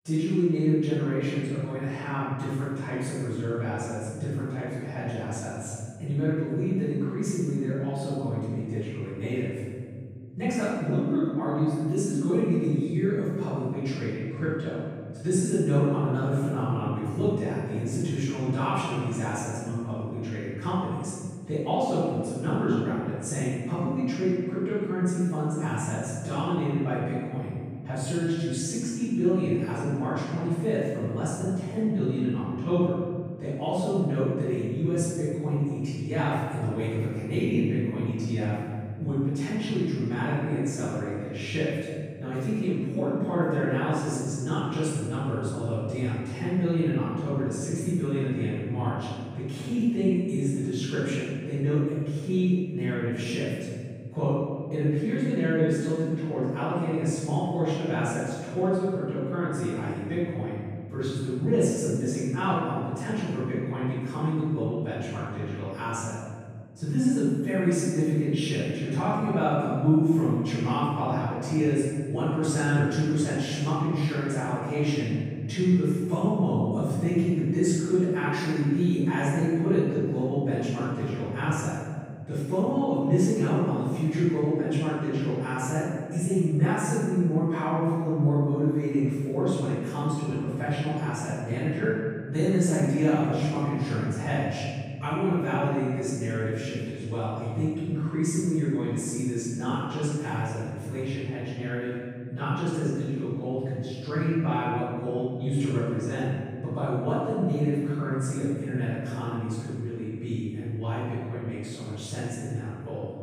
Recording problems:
room echo; strong; dies away in 2.5 s
off-mic speech; far

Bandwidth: 15.5 kHz